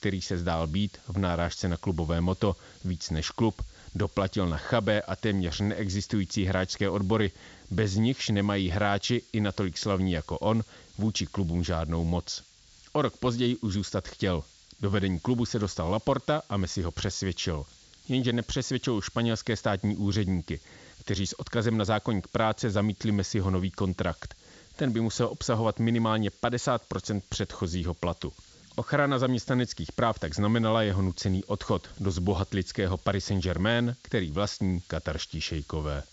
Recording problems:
high frequencies cut off; noticeable; nothing above 8 kHz
hiss; faint; throughout; 25 dB below the speech

